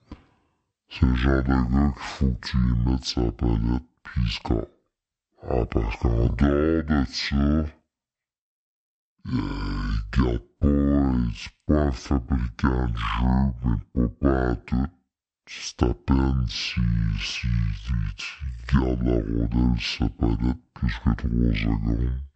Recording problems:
wrong speed and pitch; too slow and too low; 0.5 times normal speed

